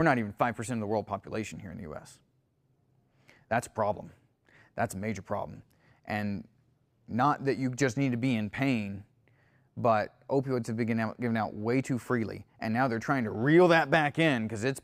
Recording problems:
abrupt cut into speech; at the start

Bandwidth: 15.5 kHz